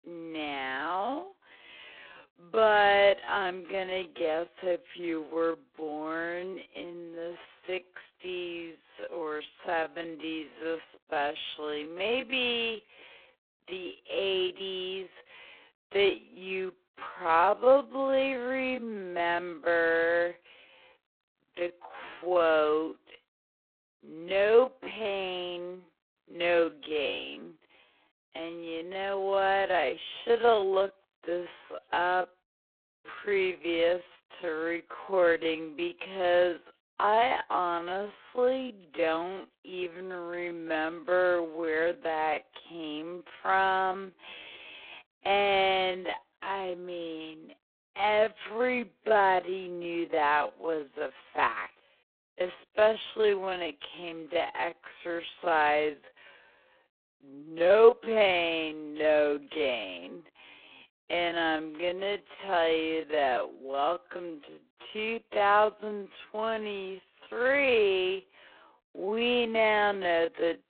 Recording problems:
phone-call audio; poor line
wrong speed, natural pitch; too slow; 0.5 times normal speed

